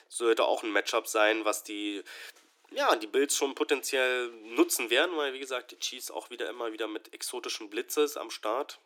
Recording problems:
thin; somewhat; fading below 300 Hz

